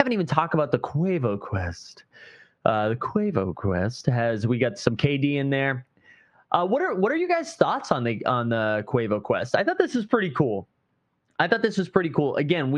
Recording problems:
muffled; slightly; fading above 2 kHz
squashed, flat; somewhat
abrupt cut into speech; at the start and the end

